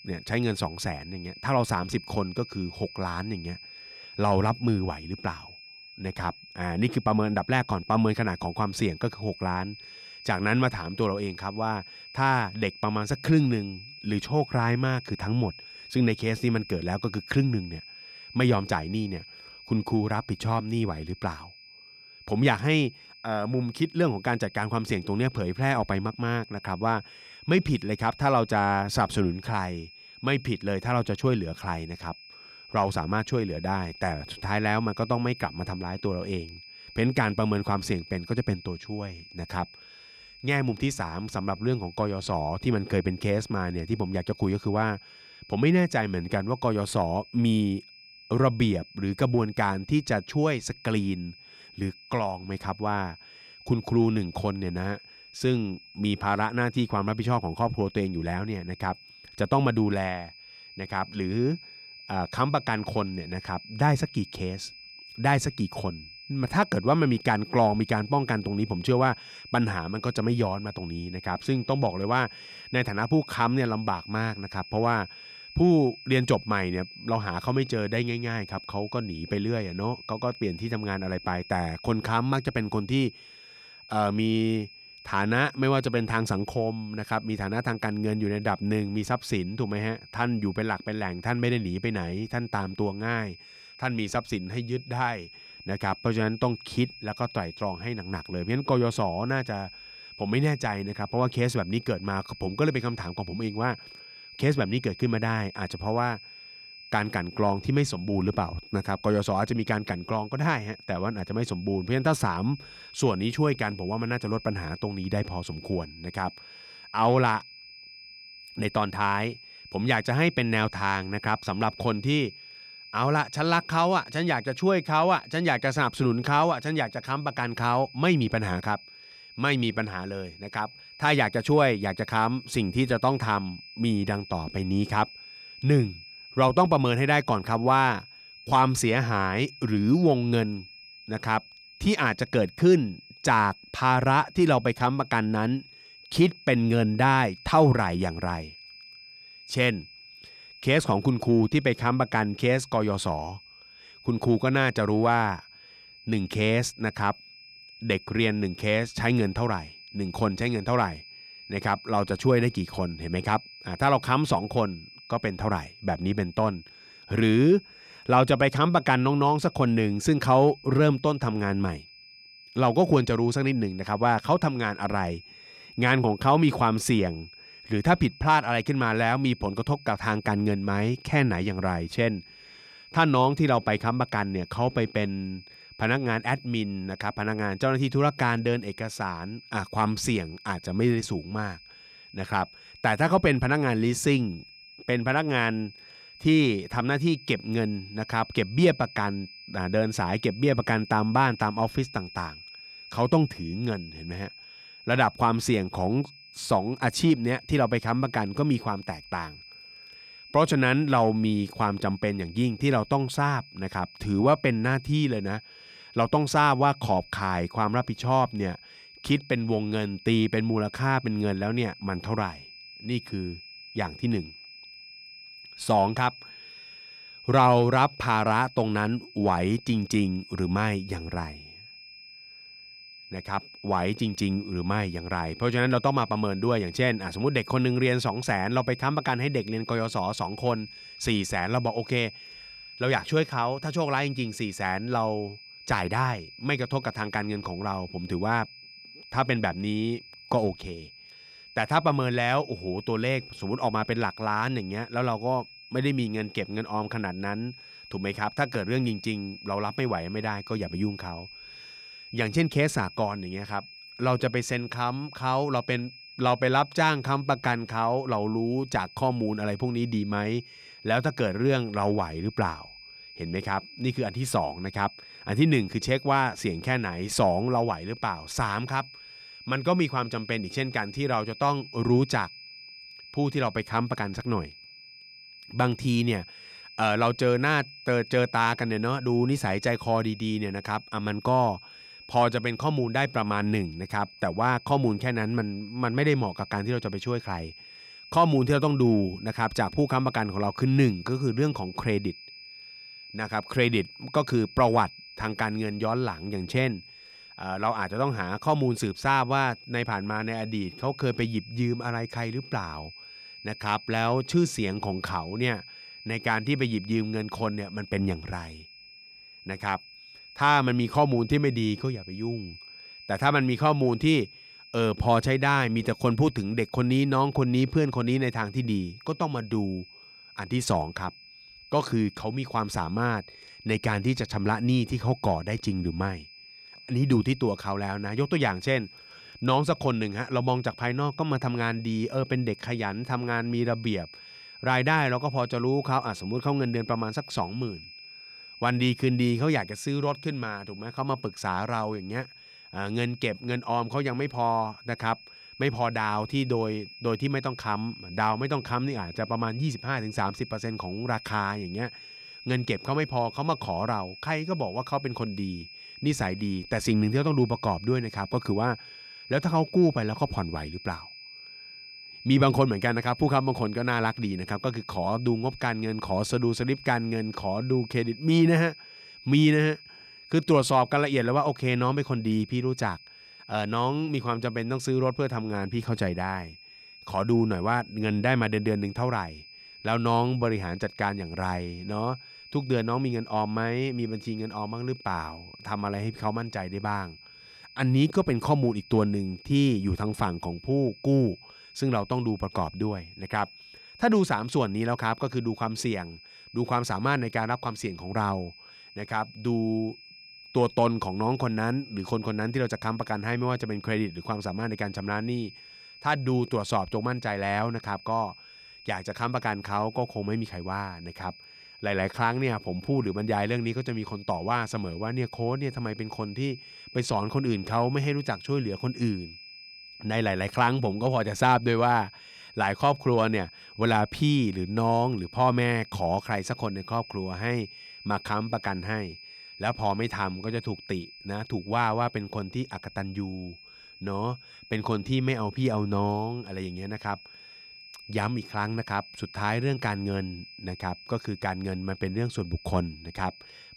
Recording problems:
high-pitched whine; noticeable; throughout; 5 kHz, 20 dB below the speech

